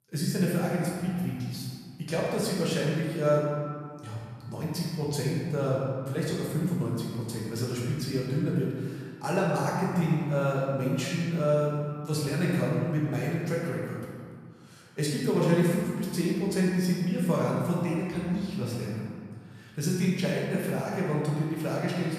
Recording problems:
room echo; strong; dies away in 1.9 s
off-mic speech; far

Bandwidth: 14.5 kHz